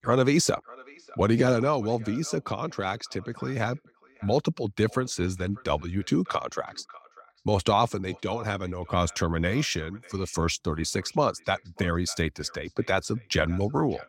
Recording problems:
echo of what is said; faint; throughout; 600 ms later, 25 dB below the speech

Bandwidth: 16 kHz